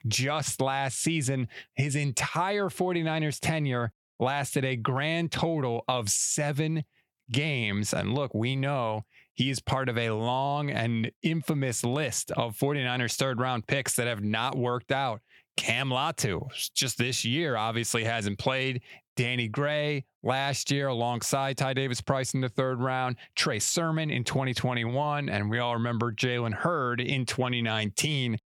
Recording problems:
squashed, flat; somewhat

